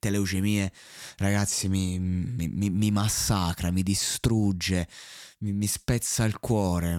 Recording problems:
abrupt cut into speech; at the end

